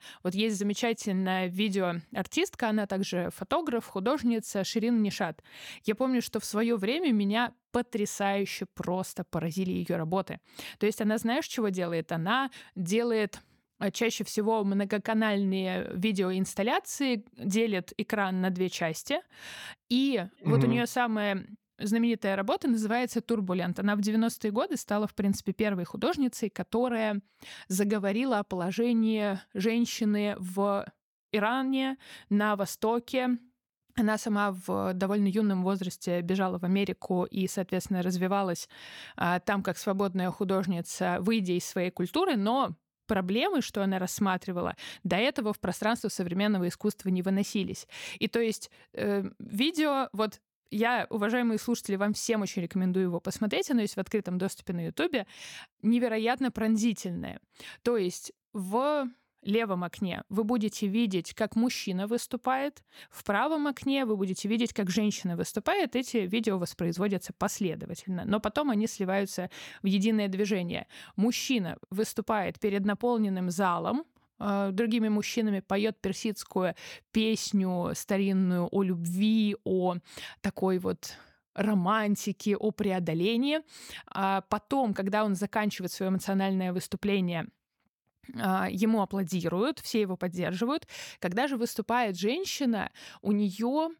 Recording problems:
none

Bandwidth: 18 kHz